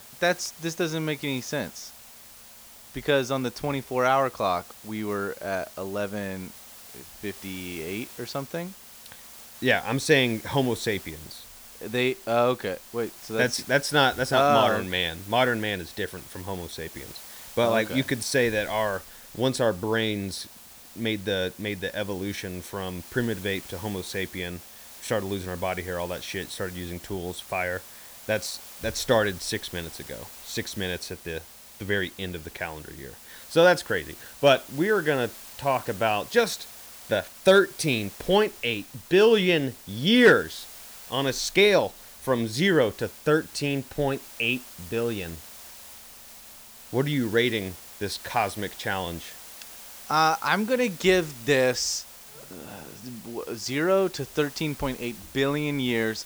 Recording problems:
hiss; noticeable; throughout; 15 dB below the speech

